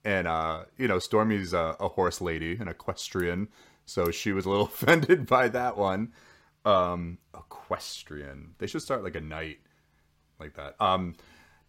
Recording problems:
none

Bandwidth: 16 kHz